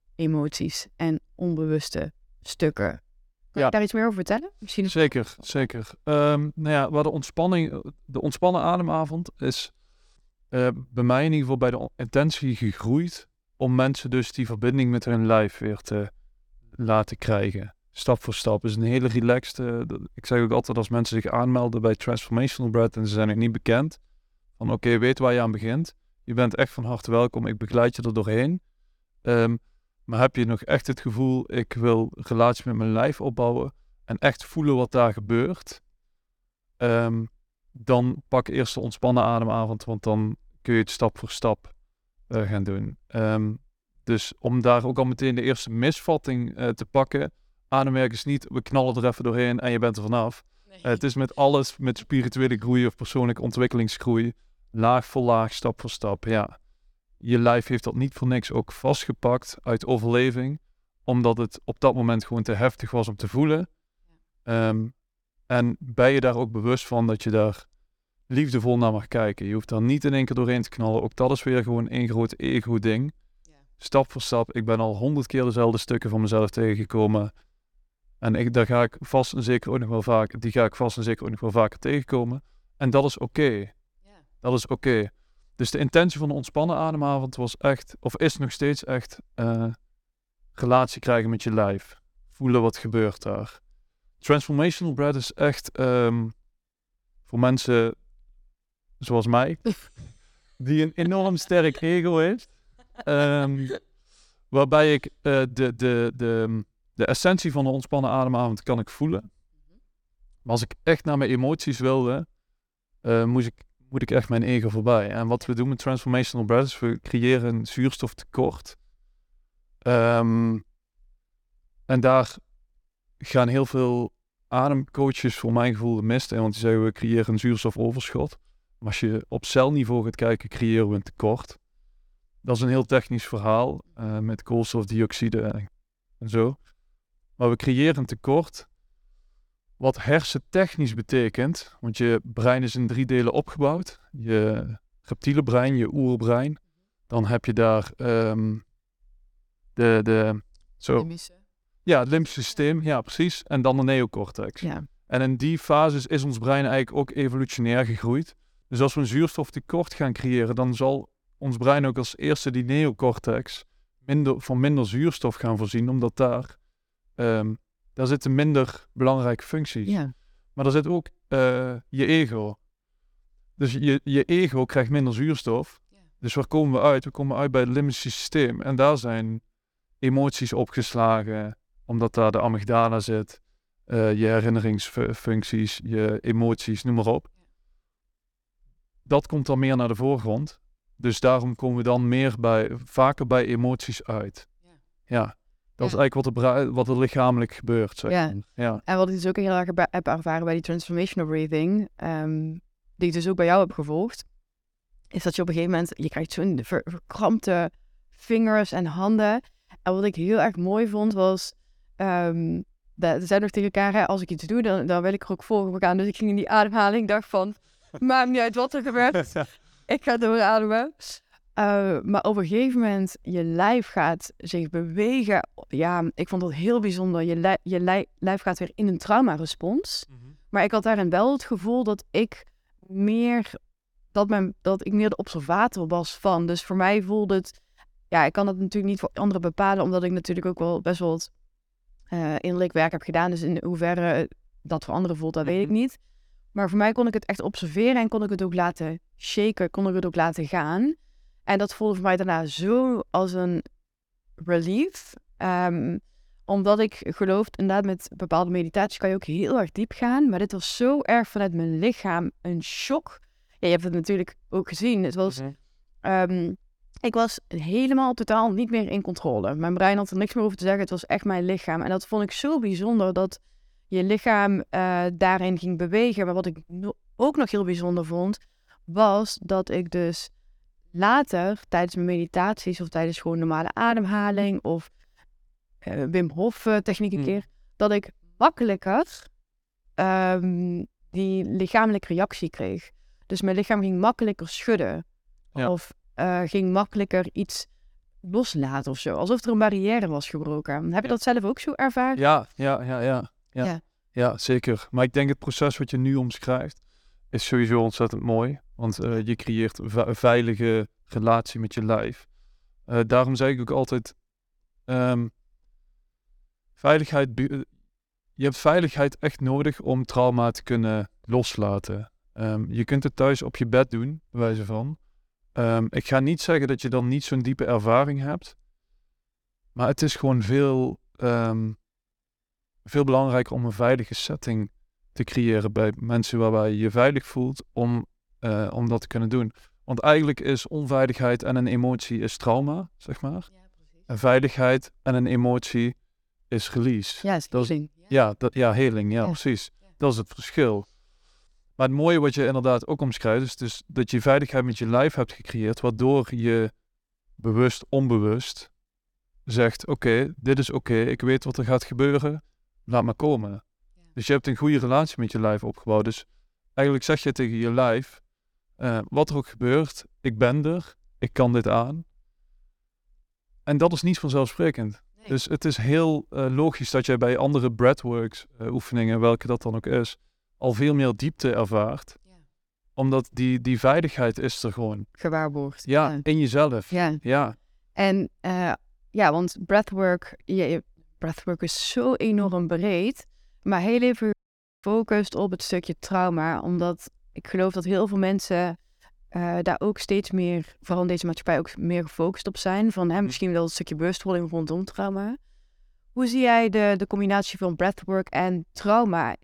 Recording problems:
audio cutting out; at 6:34 for 0.5 s

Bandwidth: 18 kHz